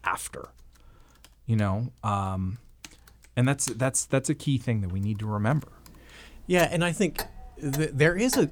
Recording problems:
household noises; noticeable; throughout; 15 dB below the speech

